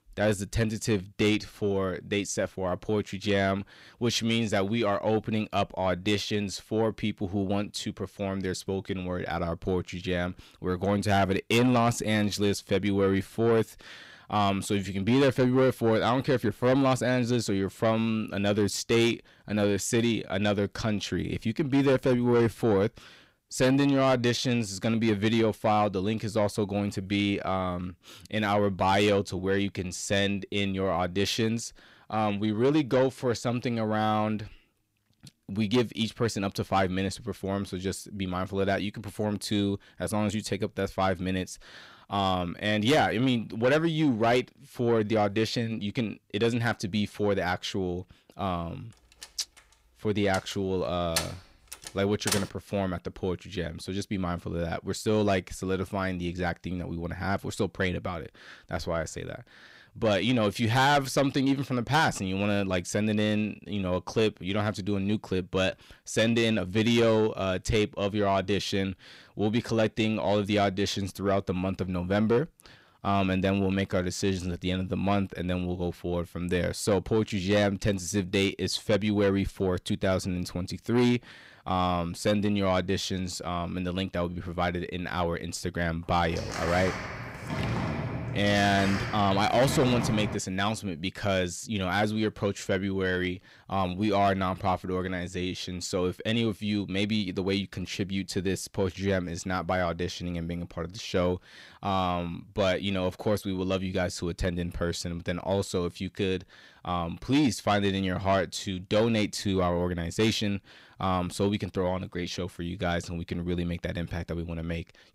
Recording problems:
distortion; slight; 10 dB below the speech
door banging; noticeable; from 49 to 52 s and from 1:26 to 1:30; peak 2 dB below the speech

